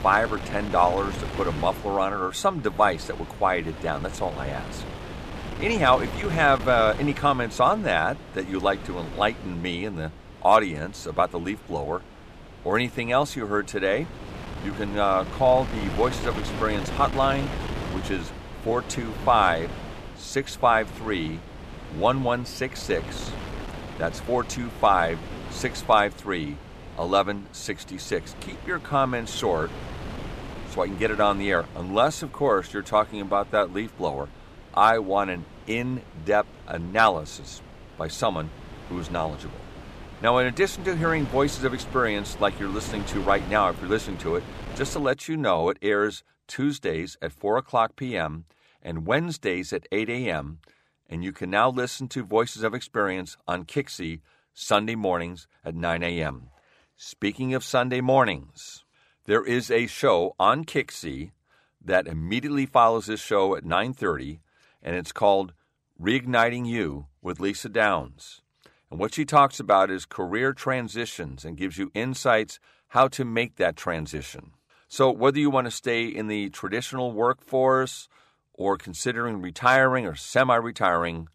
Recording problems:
wind noise on the microphone; occasional gusts; until 45 s; 15 dB below the speech

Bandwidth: 14.5 kHz